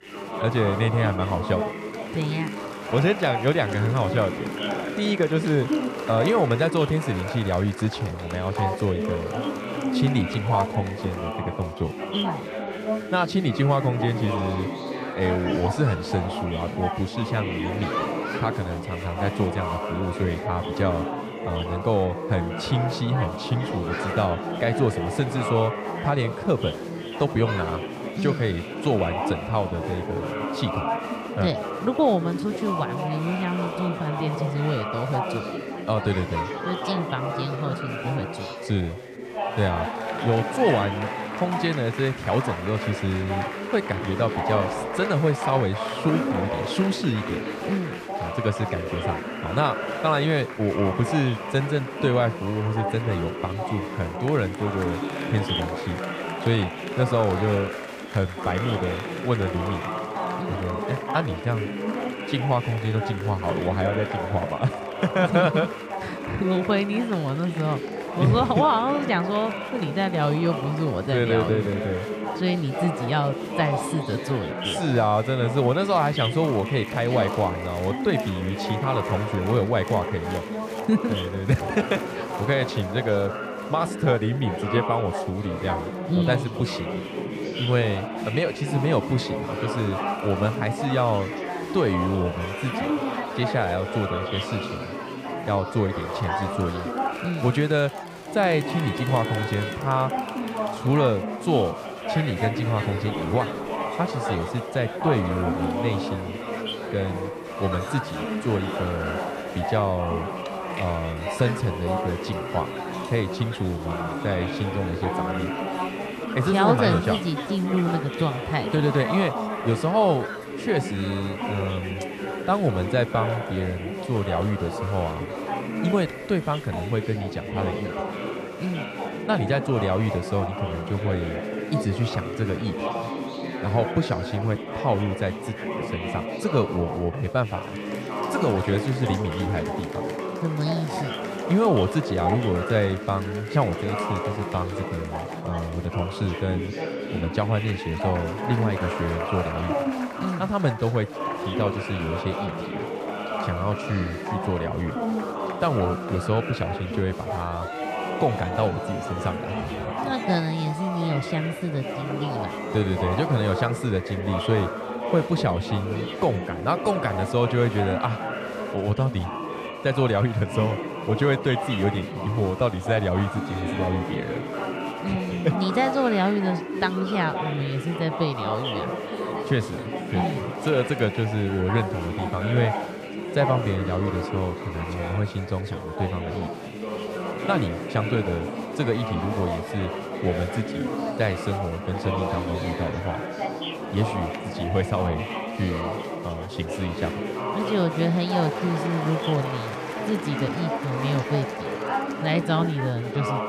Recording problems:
chatter from many people; loud; throughout; 4 dB below the speech

